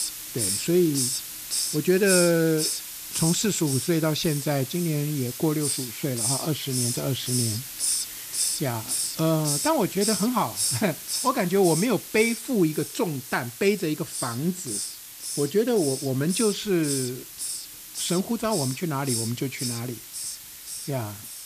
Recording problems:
hiss; loud; throughout; 3 dB below the speech

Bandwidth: 14.5 kHz